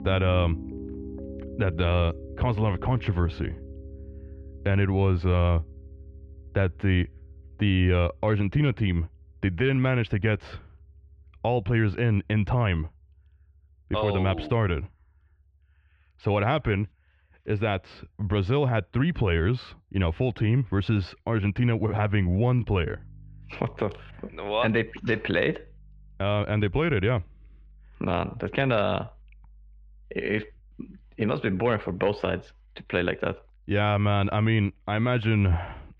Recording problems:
muffled; very; fading above 3 kHz
background music; noticeable; throughout; 20 dB below the speech

